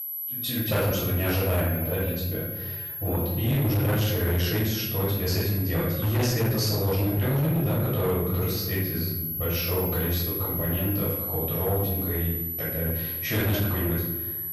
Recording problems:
off-mic speech; far
room echo; noticeable; dies away in 1 s
distortion; slight; 14% of the sound clipped
high-pitched whine; loud; throughout; 12 kHz, 4 dB below the speech
animal sounds; very faint; throughout; 20 dB below the speech

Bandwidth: 14.5 kHz